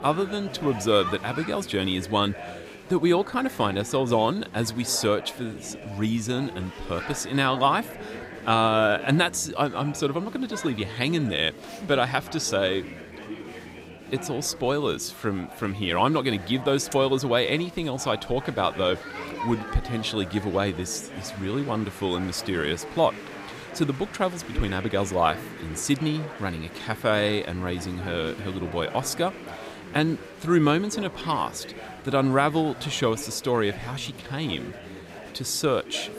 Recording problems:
chatter from many people; noticeable; throughout; 15 dB below the speech

